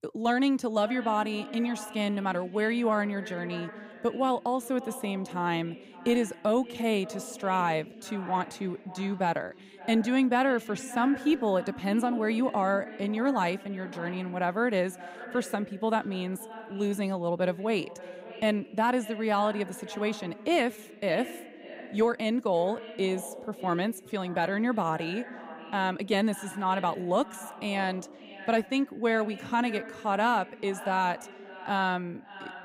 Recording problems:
echo of what is said; noticeable; throughout; 570 ms later, 15 dB below the speech

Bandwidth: 15.5 kHz